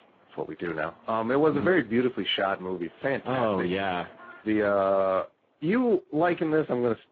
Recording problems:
garbled, watery; badly
phone-call audio; nothing above 7.5 kHz
animal sounds; faint; throughout; 25 dB below the speech

